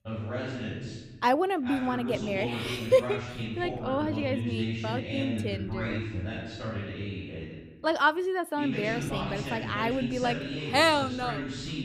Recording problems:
voice in the background; loud; throughout; 6 dB below the speech

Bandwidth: 15 kHz